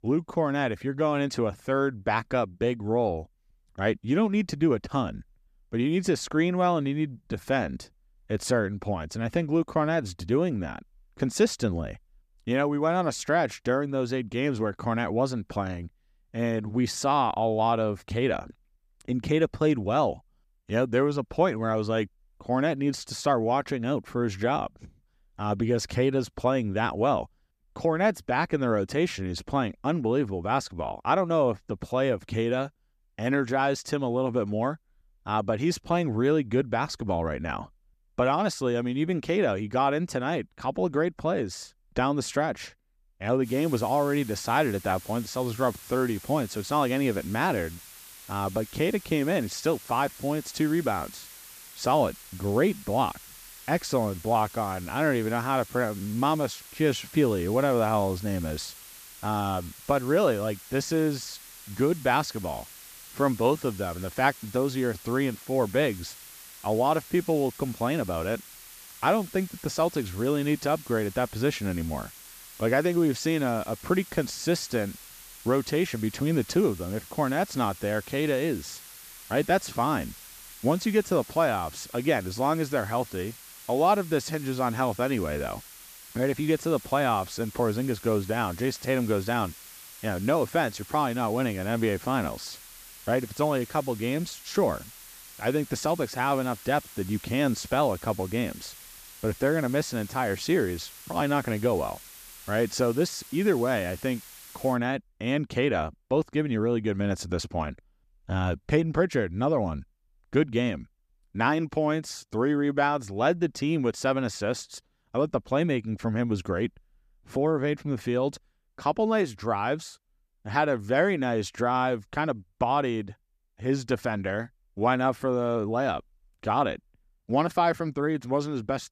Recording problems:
hiss; noticeable; from 43 s to 1:45; 15 dB below the speech

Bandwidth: 14.5 kHz